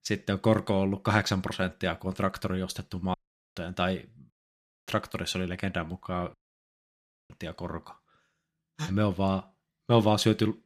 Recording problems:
audio cutting out; at 3 s, at 4.5 s for 0.5 s and at 6.5 s for 1 s

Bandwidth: 14.5 kHz